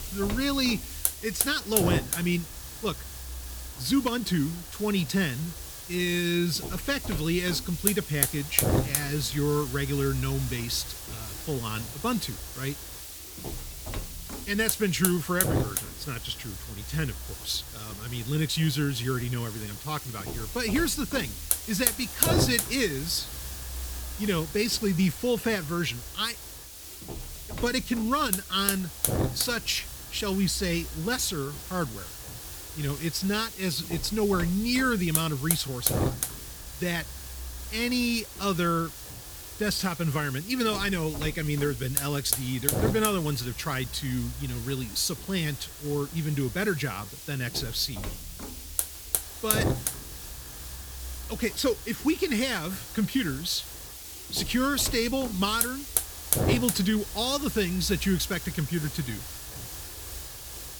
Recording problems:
hiss; loud; throughout; 4 dB below the speech

